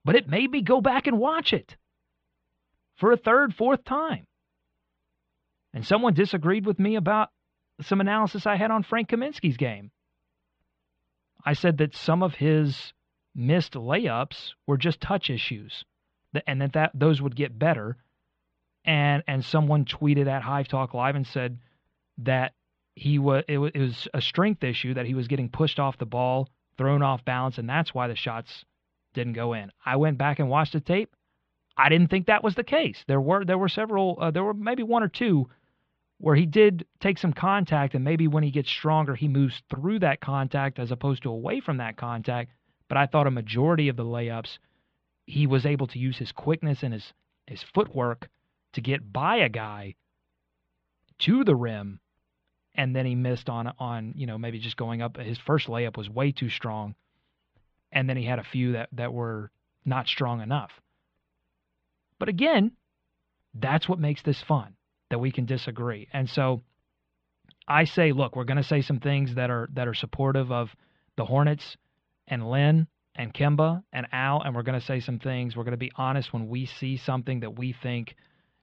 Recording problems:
muffled; very; fading above 3.5 kHz

